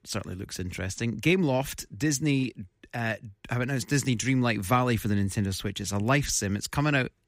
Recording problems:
none

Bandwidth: 15.5 kHz